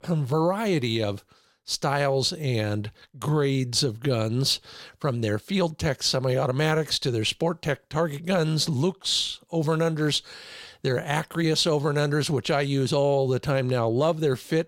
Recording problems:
none

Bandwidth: 16 kHz